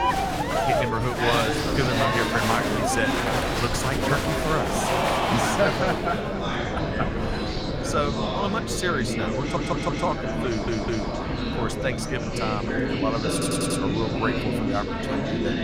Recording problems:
murmuring crowd; very loud; throughout; 2 dB above the speech
wind noise on the microphone; occasional gusts; 15 dB below the speech
high-pitched whine; faint; from 6 s on; 2 kHz, 20 dB below the speech
audio stuttering; at 9.5 s, at 10 s and at 13 s

